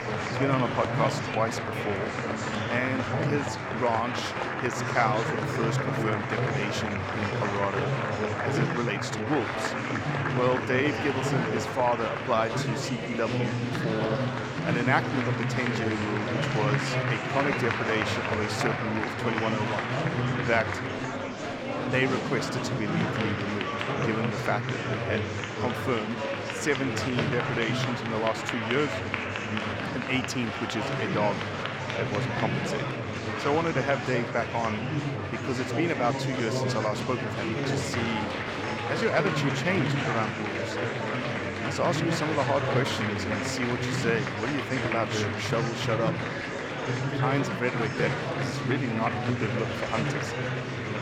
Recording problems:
murmuring crowd; very loud; throughout; 1 dB above the speech

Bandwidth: 18 kHz